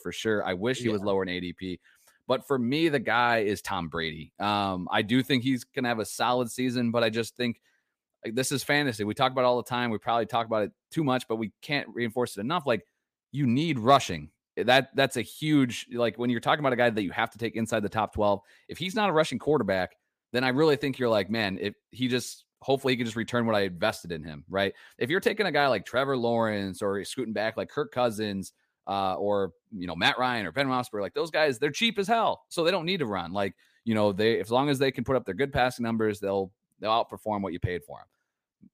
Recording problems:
none

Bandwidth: 15 kHz